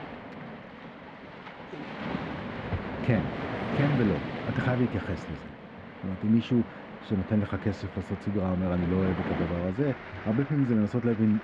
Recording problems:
muffled; very; fading above 2 kHz
rain or running water; loud; throughout; 8 dB below the speech

